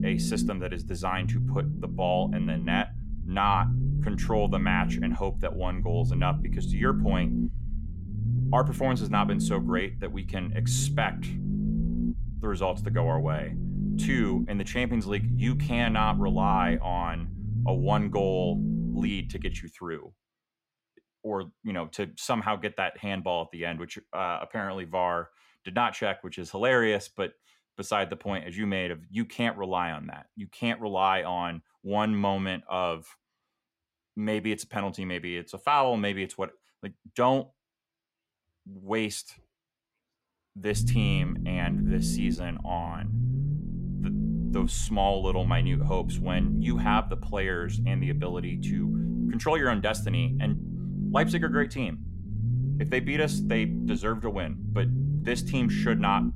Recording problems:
low rumble; loud; until 20 s and from 41 s on; 9 dB below the speech

